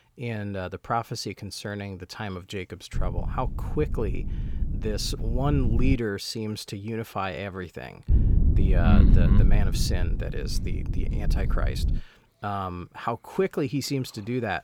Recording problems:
low rumble; loud; from 3 to 6 s and from 8 to 12 s; 8 dB below the speech

